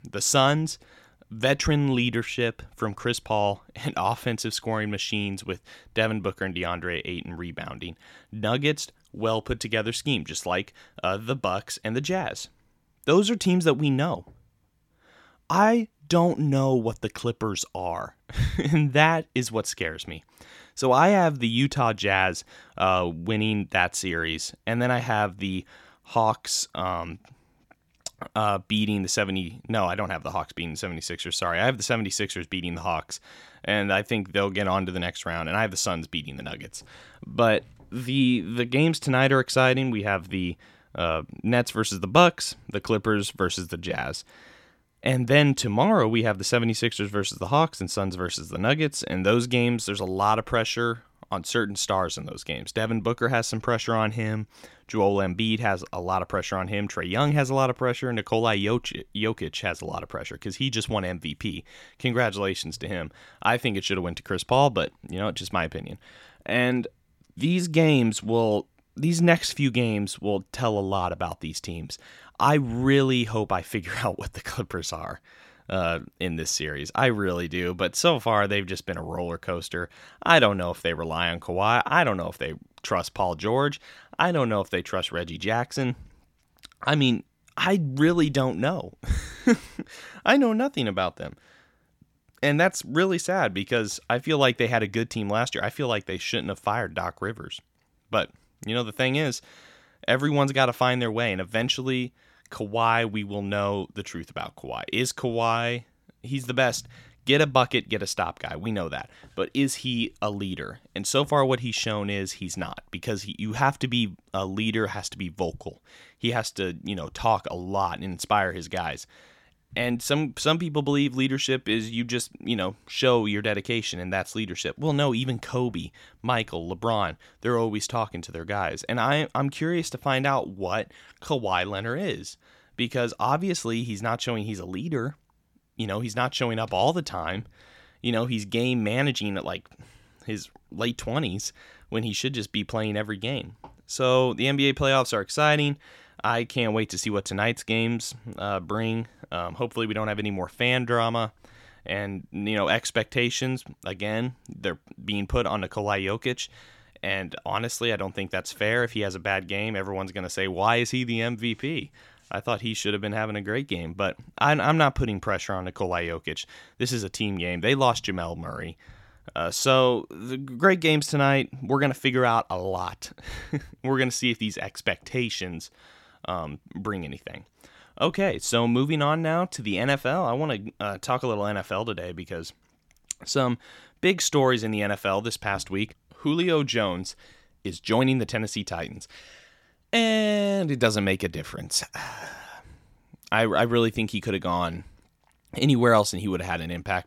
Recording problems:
none

